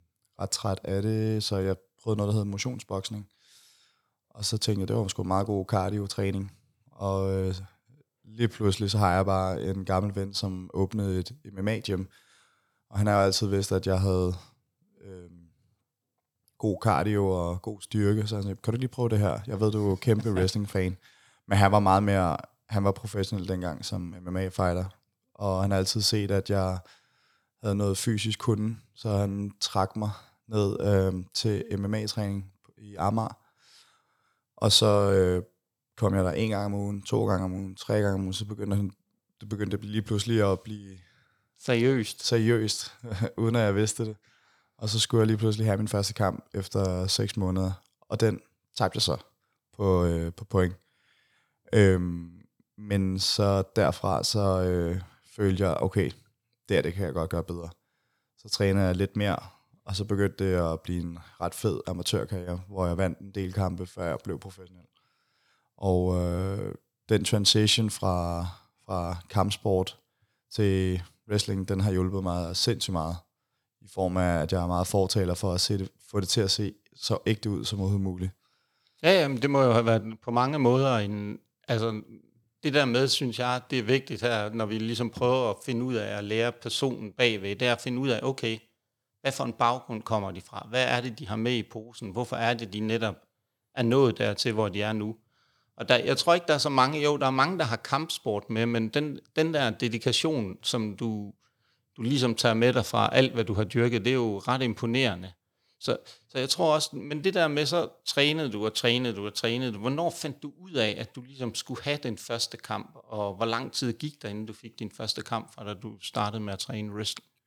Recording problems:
none

